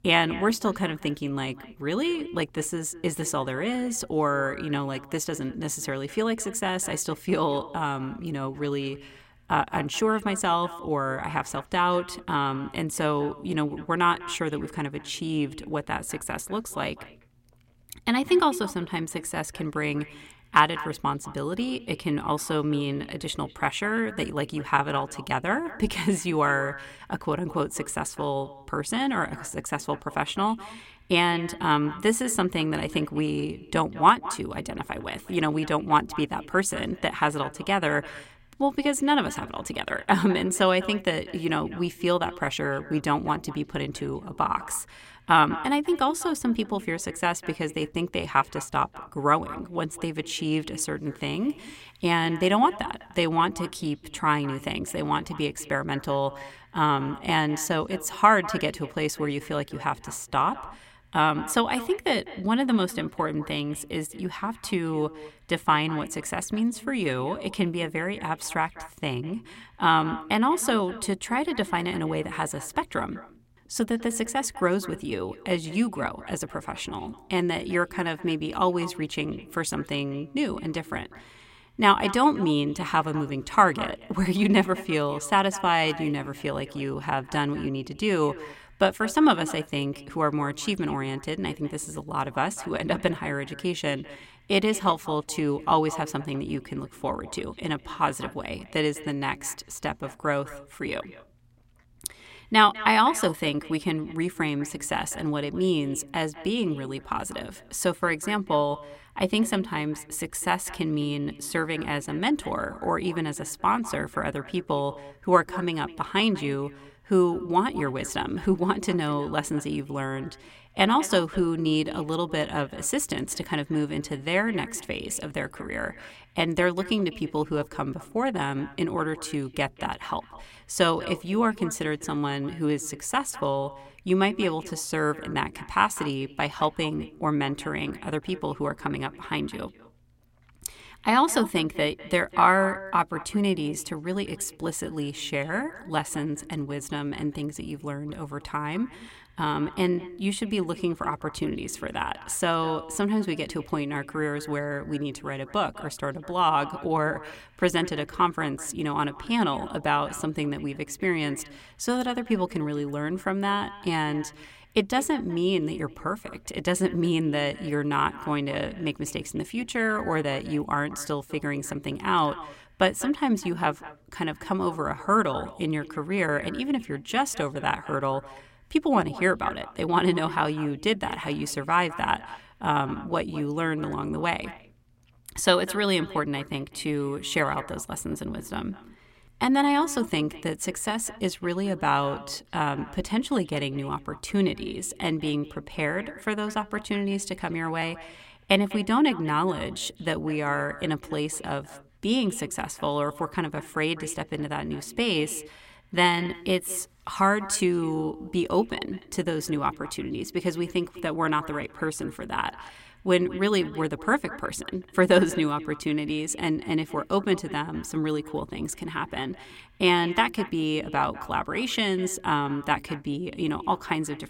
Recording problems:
echo of what is said; noticeable; throughout; 200 ms later, 15 dB below the speech

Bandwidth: 16 kHz